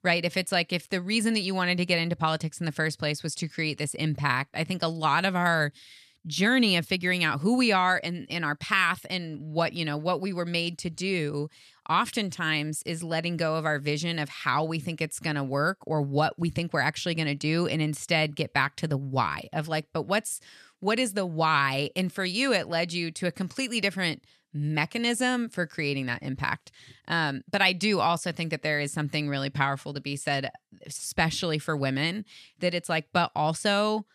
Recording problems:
none

